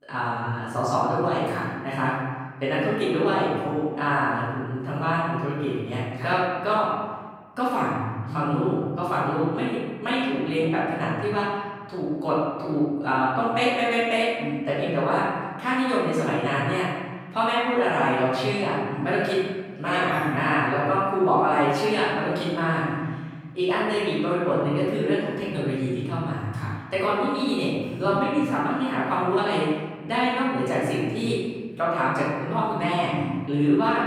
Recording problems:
room echo; strong; dies away in 1.4 s
off-mic speech; far

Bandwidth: 18 kHz